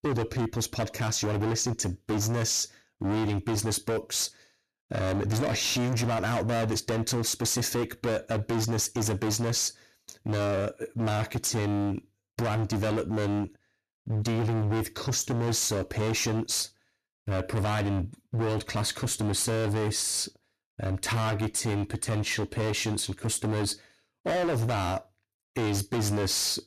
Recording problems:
distortion; heavy; 28% of the sound clipped

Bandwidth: 14 kHz